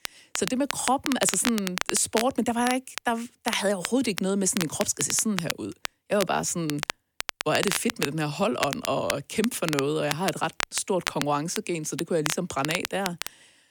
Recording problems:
crackle, like an old record; loud; 6 dB below the speech

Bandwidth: 18 kHz